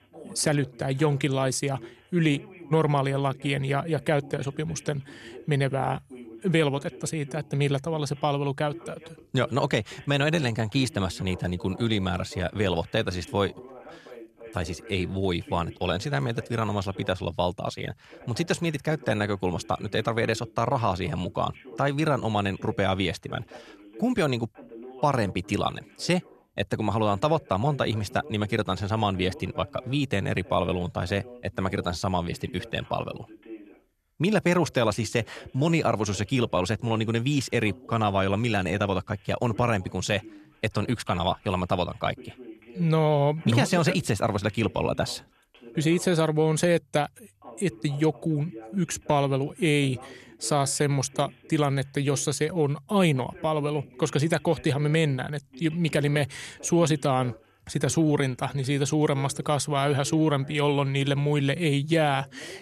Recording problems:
voice in the background; faint; throughout; 20 dB below the speech

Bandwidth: 13.5 kHz